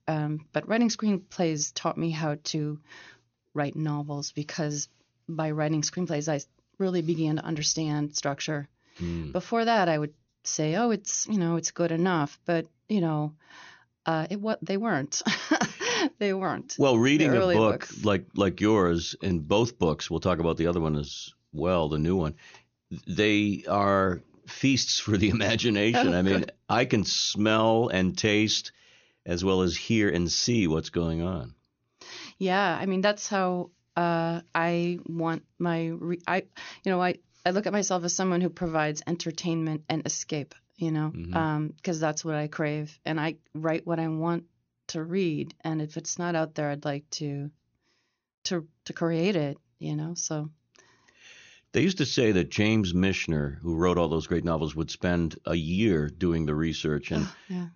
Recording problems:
high frequencies cut off; noticeable; nothing above 6.5 kHz

